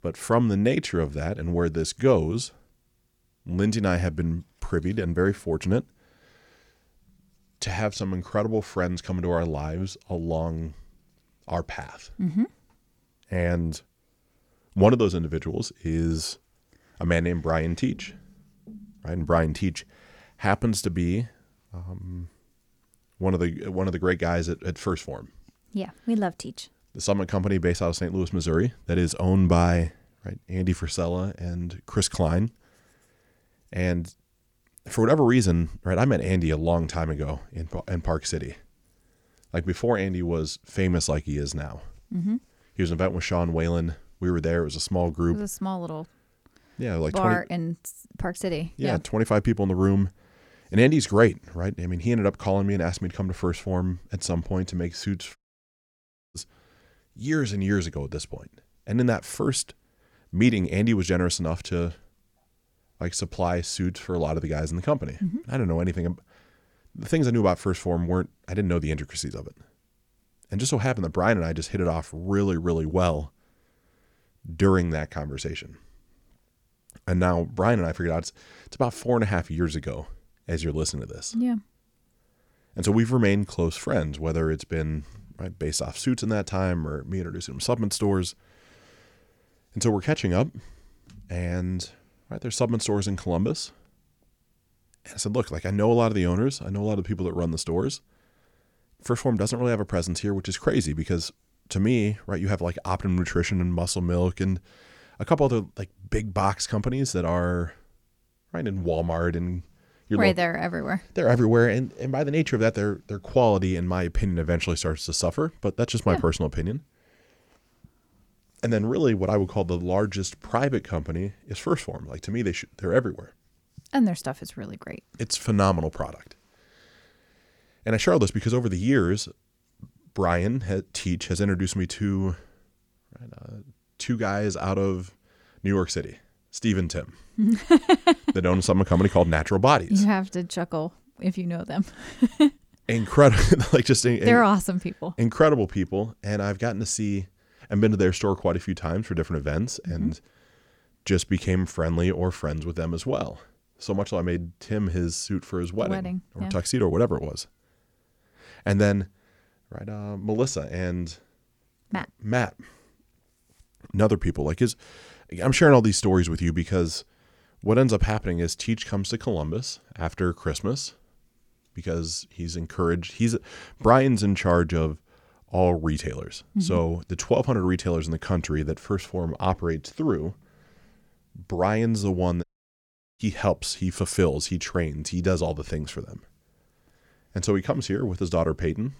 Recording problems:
audio cutting out; at 55 s for 1 s and at 3:02 for 1 s

